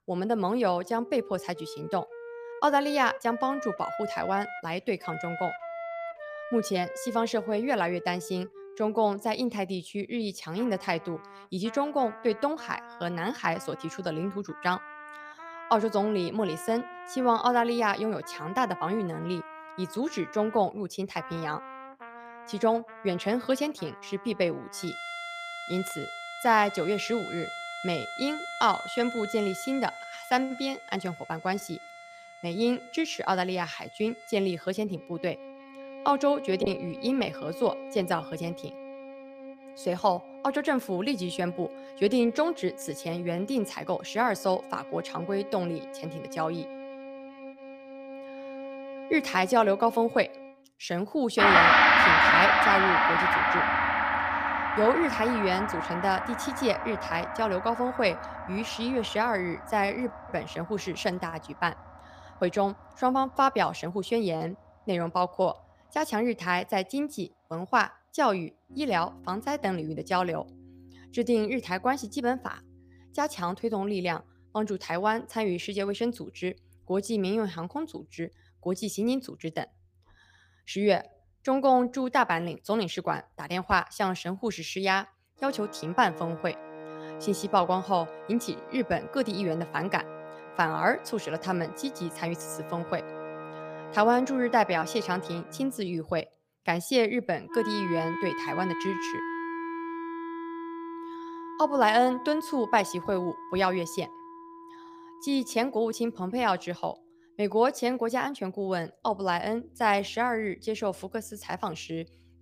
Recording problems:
background music; loud; throughout; 2 dB below the speech

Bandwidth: 15 kHz